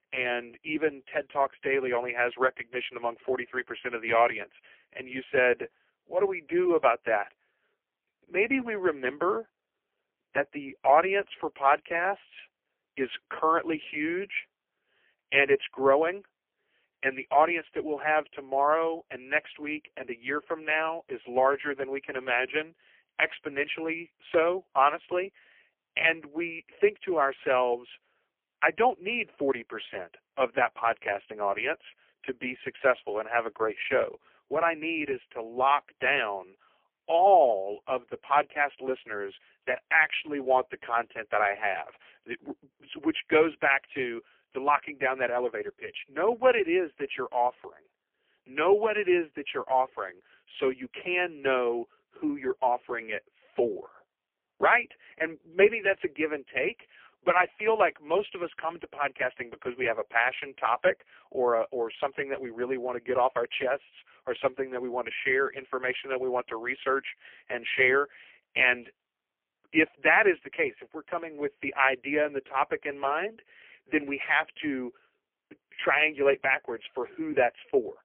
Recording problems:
phone-call audio; poor line; nothing above 3 kHz

